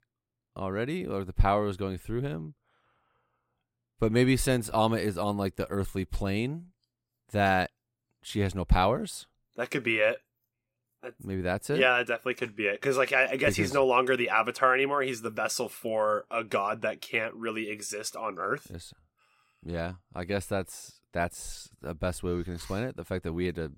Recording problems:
none

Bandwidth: 16.5 kHz